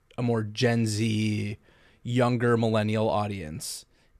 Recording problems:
none

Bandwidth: 13.5 kHz